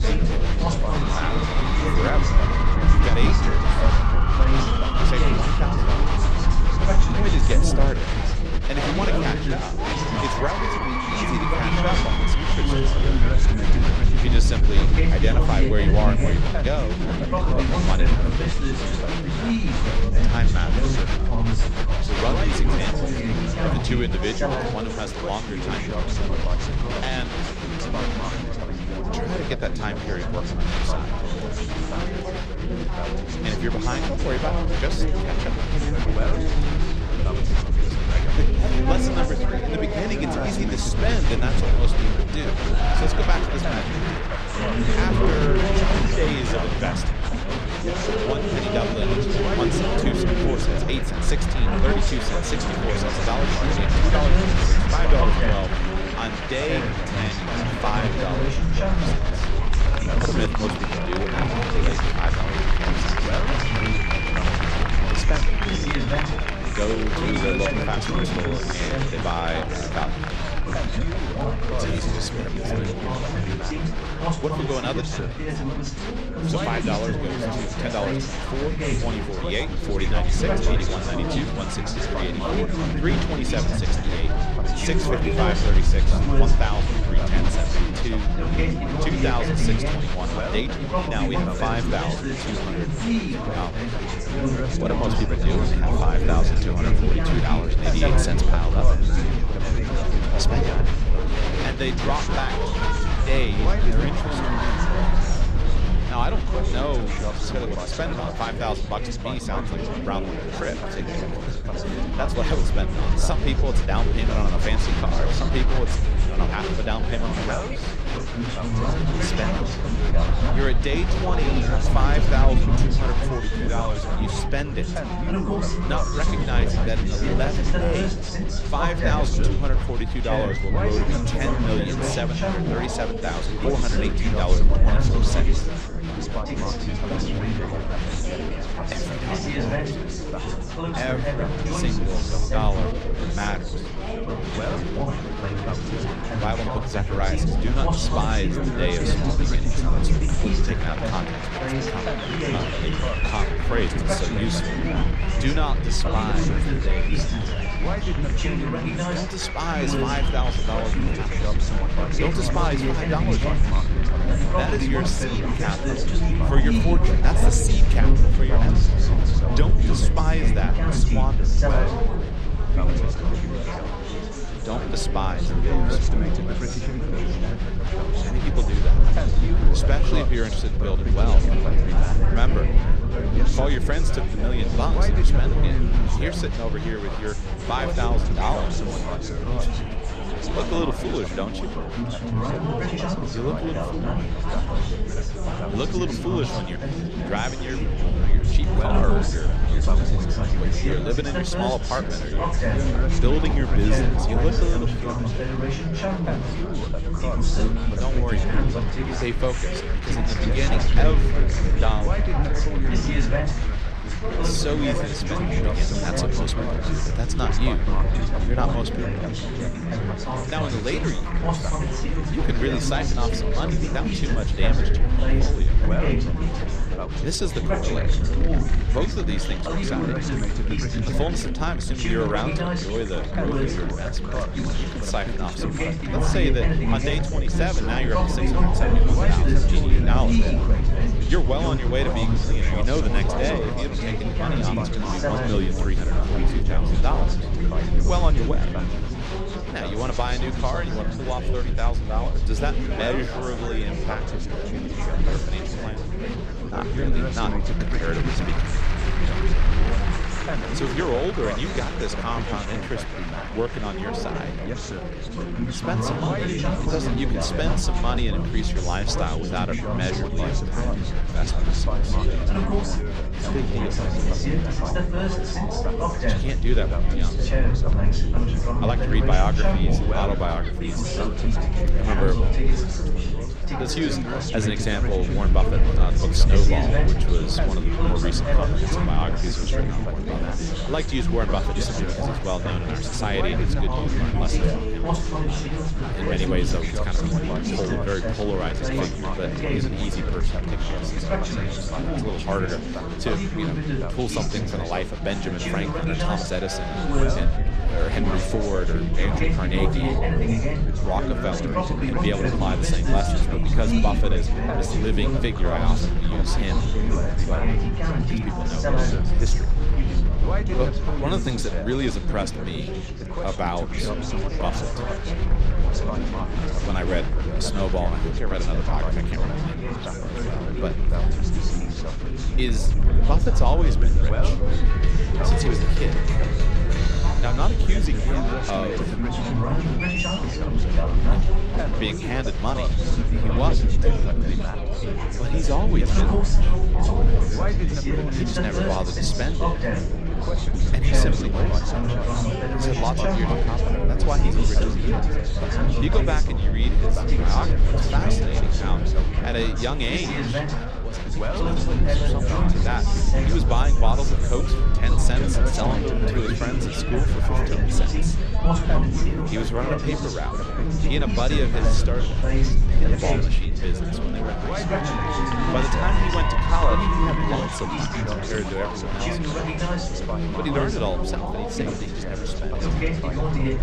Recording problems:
chatter from many people; very loud; throughout; 3 dB above the speech
low rumble; noticeable; throughout; 15 dB below the speech

